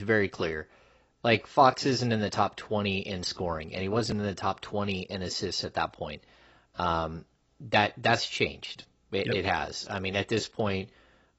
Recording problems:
garbled, watery; badly; nothing above 8 kHz
abrupt cut into speech; at the start

